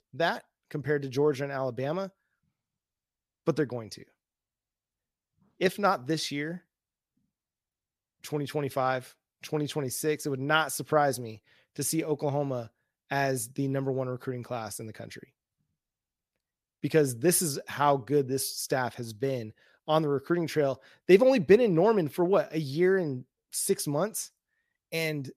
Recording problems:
none

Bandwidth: 14.5 kHz